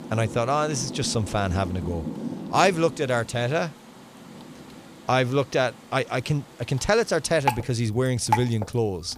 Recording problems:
rain or running water; loud; throughout; 9 dB below the speech

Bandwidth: 15 kHz